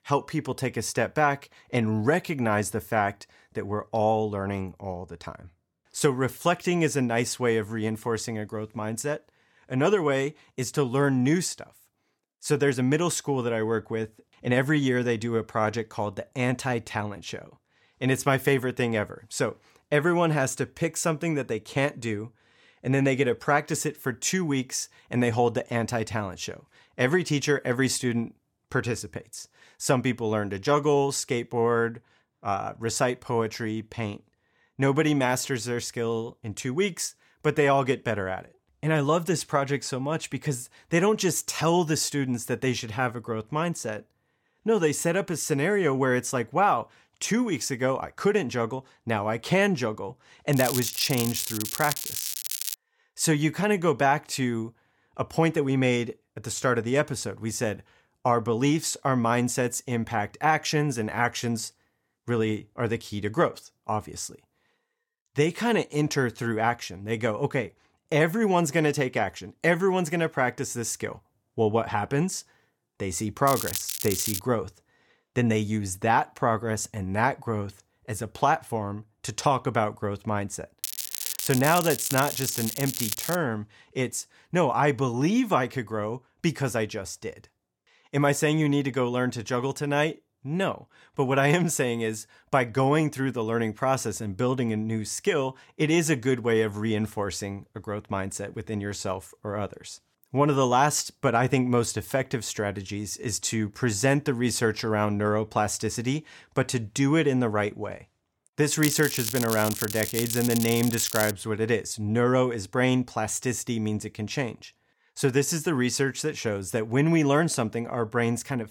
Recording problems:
crackling; loud; 4 times, first at 51 s; 4 dB below the speech

